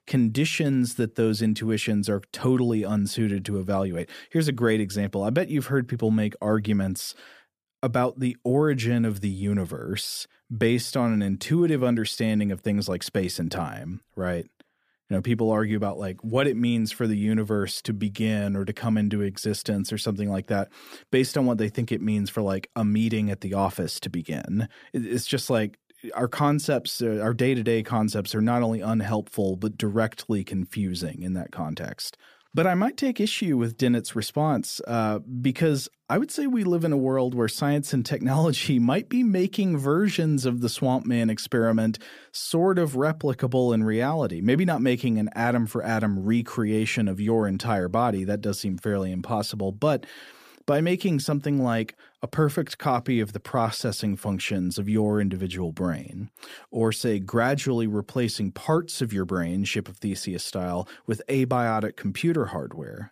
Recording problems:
none

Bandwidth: 15 kHz